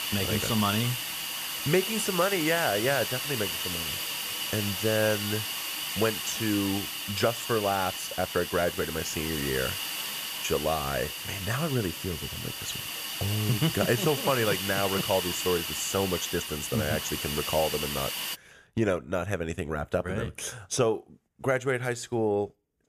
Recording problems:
hiss; loud; until 18 s; 2 dB below the speech

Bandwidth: 14.5 kHz